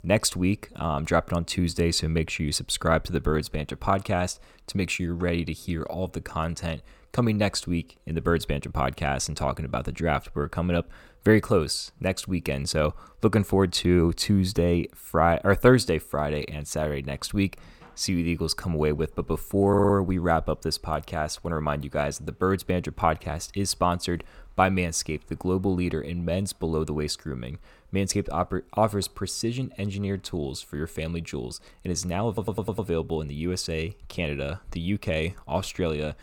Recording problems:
audio stuttering; at 20 s and at 32 s

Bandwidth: 17.5 kHz